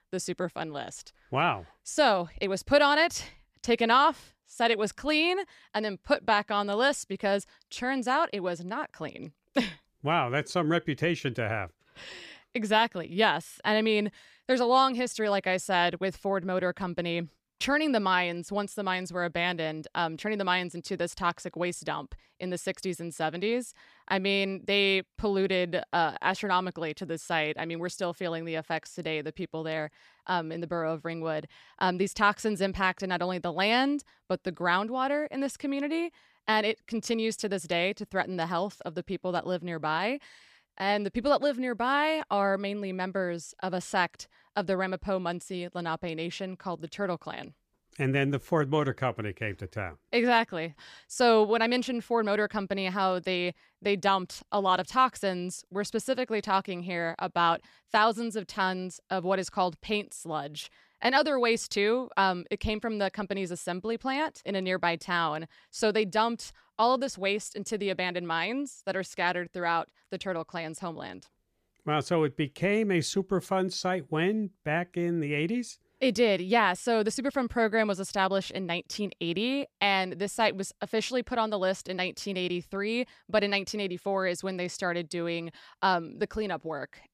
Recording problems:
none

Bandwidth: 14.5 kHz